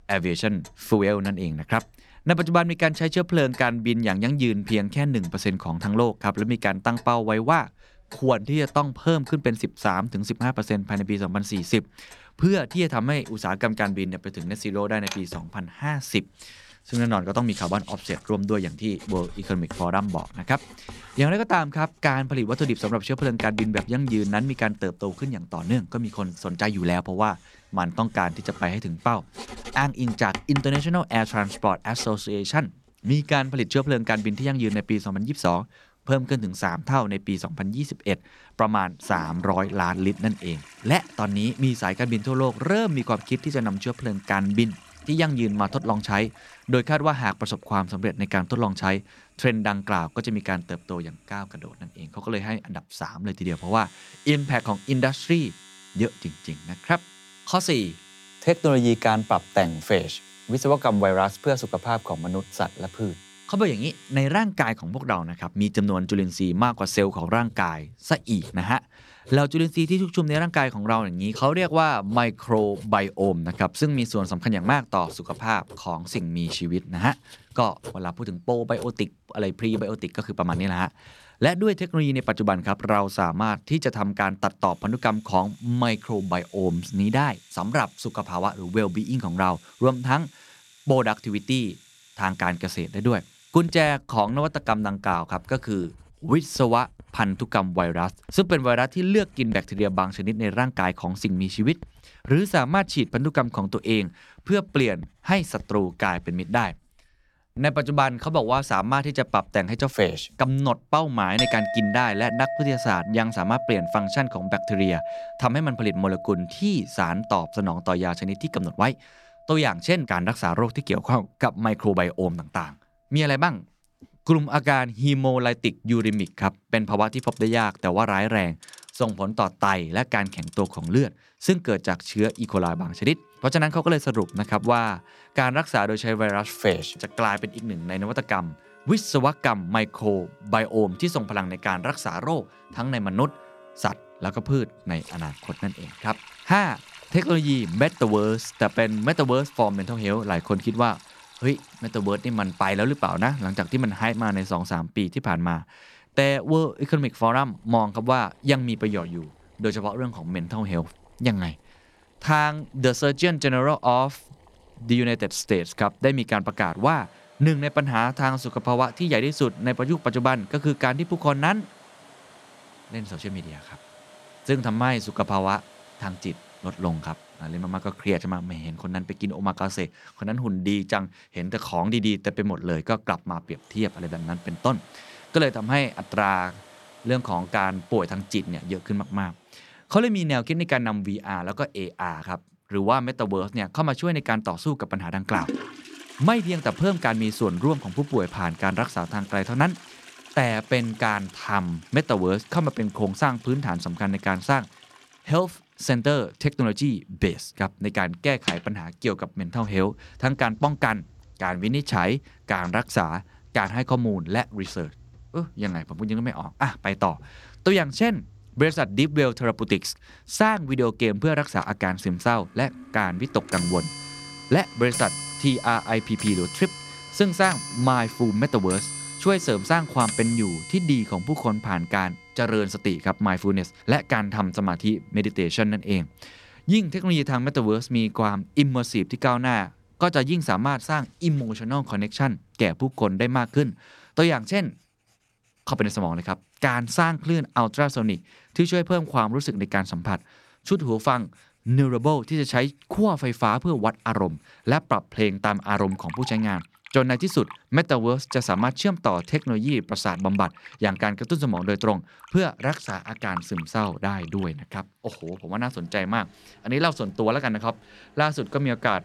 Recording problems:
household noises; noticeable; throughout; 15 dB below the speech

